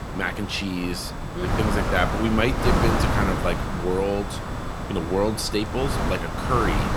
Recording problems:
wind noise on the microphone; heavy; 2 dB below the speech
high-pitched whine; faint; throughout; 3.5 kHz, 25 dB below the speech
animal sounds; faint; throughout; 25 dB below the speech
hiss; faint; throughout; 25 dB below the speech

